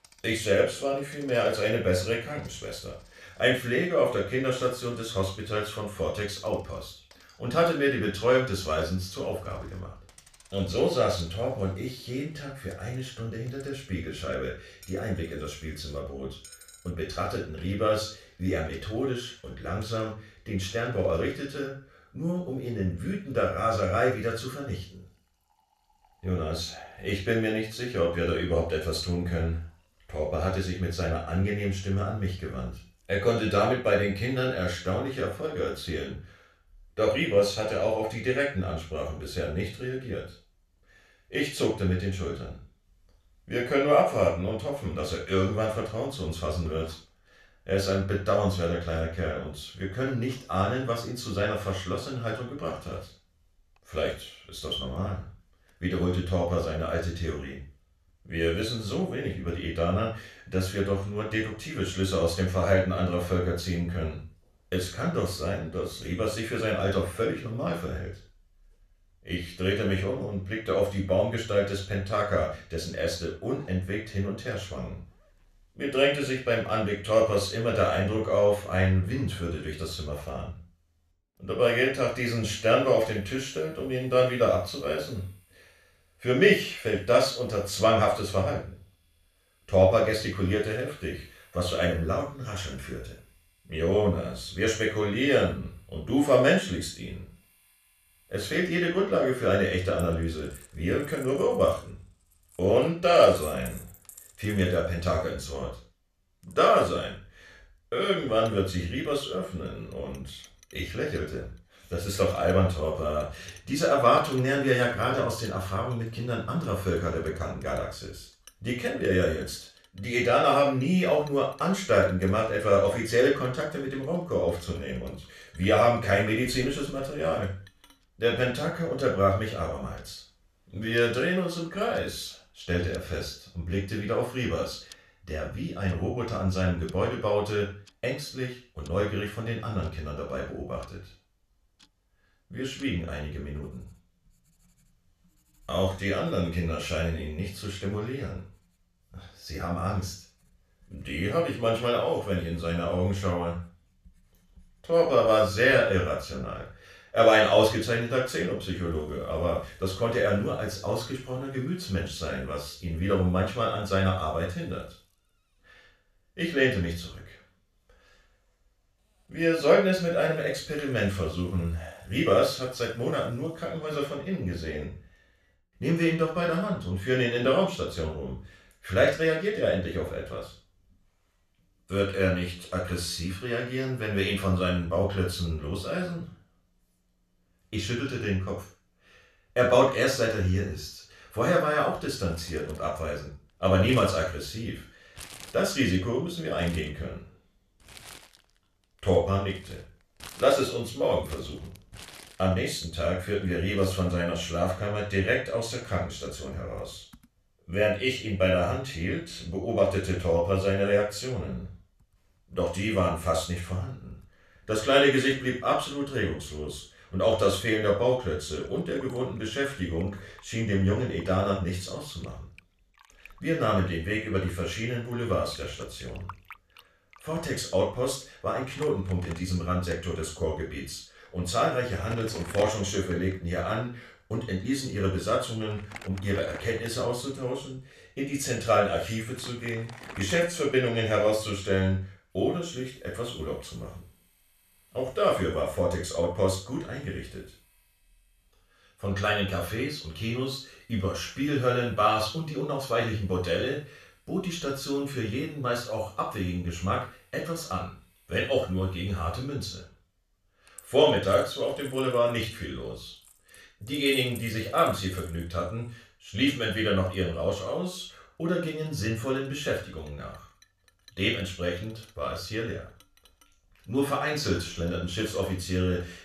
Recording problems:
off-mic speech; far
room echo; noticeable; dies away in 0.3 s
household noises; faint; throughout; 25 dB below the speech

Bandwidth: 14 kHz